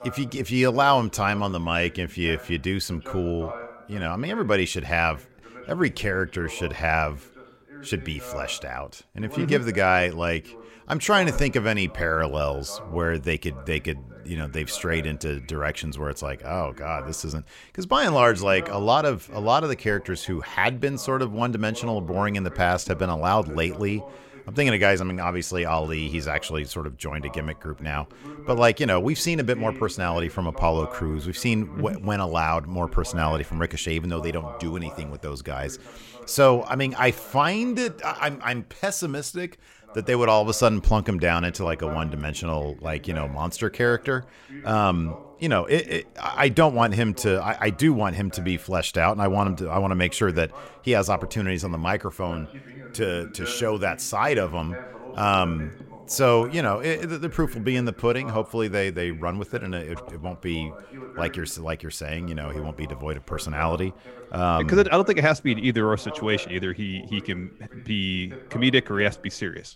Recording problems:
voice in the background; noticeable; throughout; 20 dB below the speech

